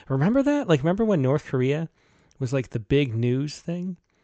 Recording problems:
high frequencies cut off; noticeable; nothing above 8 kHz

